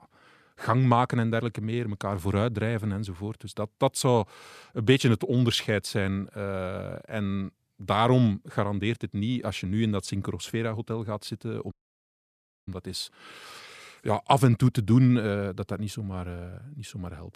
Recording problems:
audio cutting out; at 12 s for 1 s

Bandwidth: 14 kHz